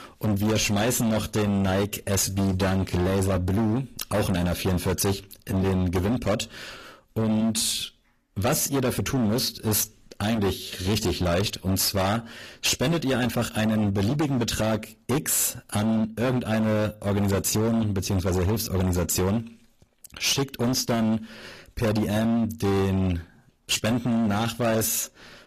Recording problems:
distortion; heavy; 23% of the sound clipped
garbled, watery; slightly; nothing above 14.5 kHz

